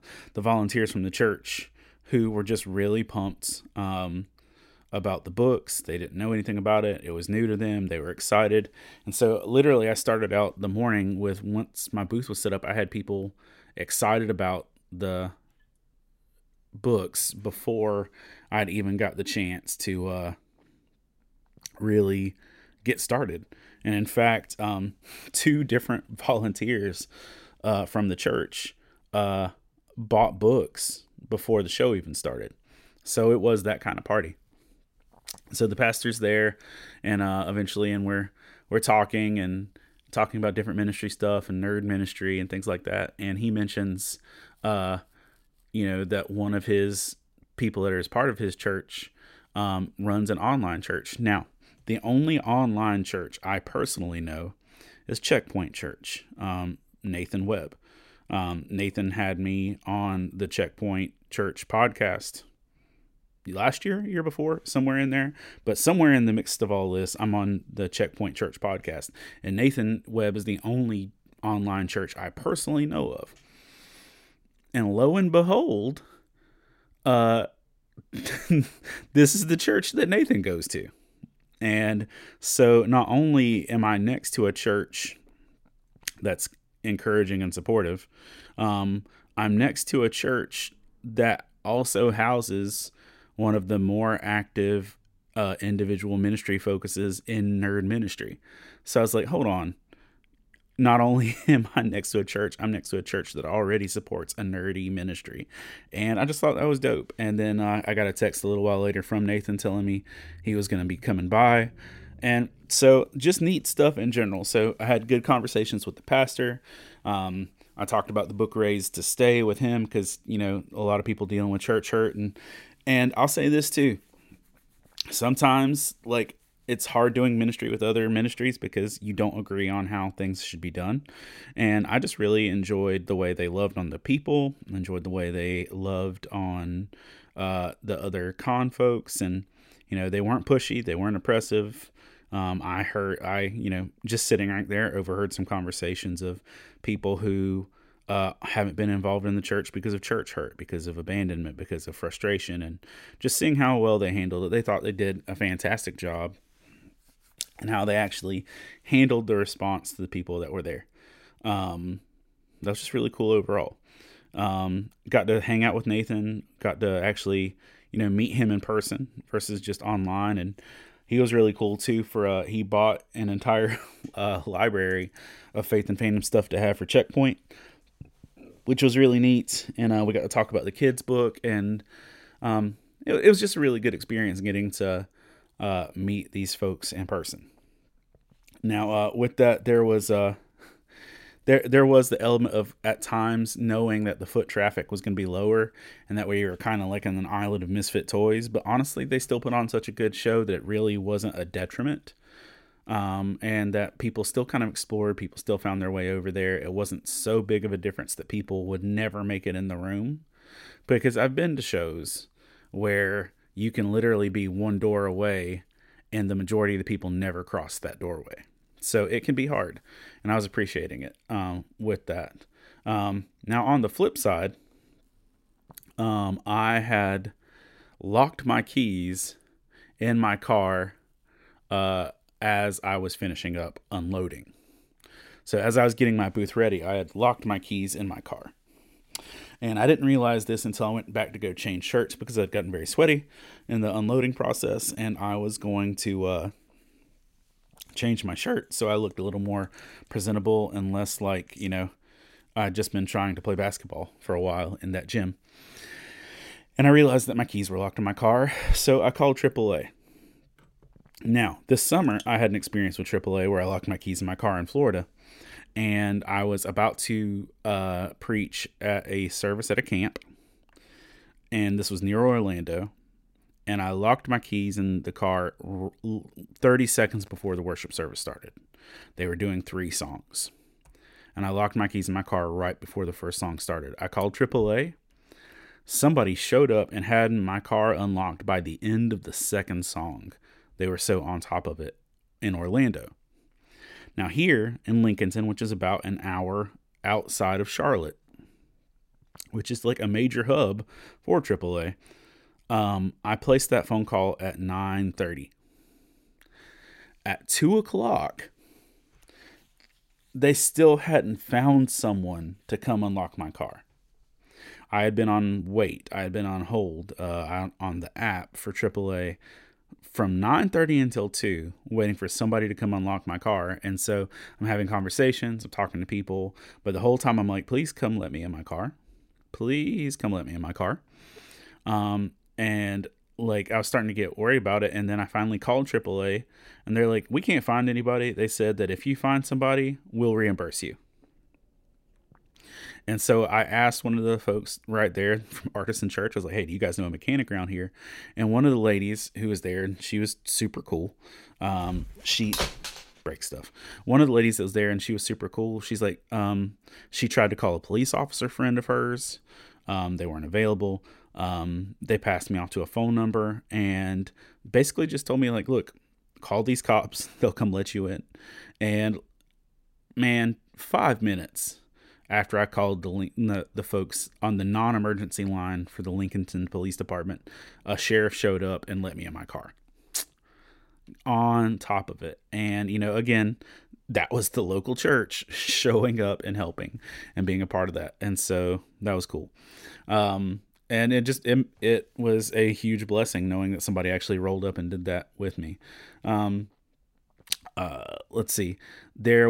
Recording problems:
abrupt cut into speech; at the end

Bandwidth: 16 kHz